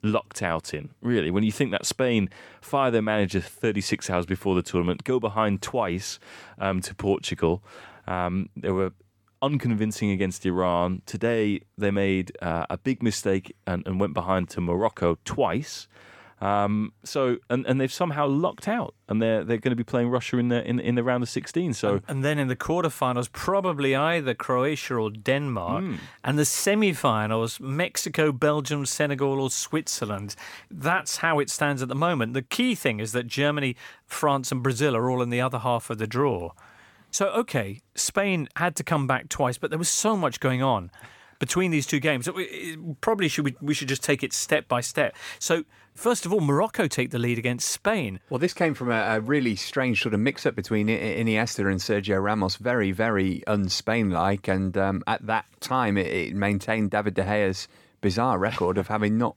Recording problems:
none

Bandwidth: 17.5 kHz